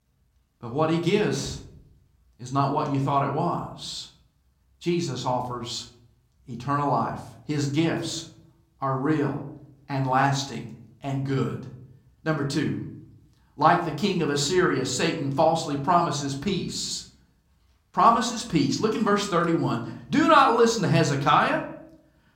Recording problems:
room echo; slight; dies away in 0.5 s
off-mic speech; somewhat distant

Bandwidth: 16.5 kHz